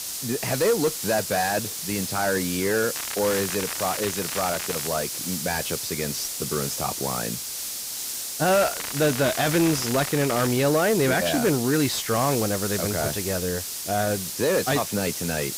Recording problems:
distortion; slight; 10 dB below the speech
garbled, watery; slightly; nothing above 10.5 kHz
hiss; loud; throughout; 4 dB below the speech
crackling; noticeable; from 3 to 5 s and from 8.5 to 11 s; 10 dB below the speech

